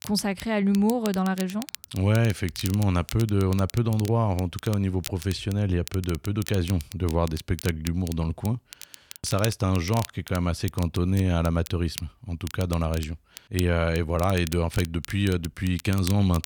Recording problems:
crackle, like an old record; noticeable; 15 dB below the speech

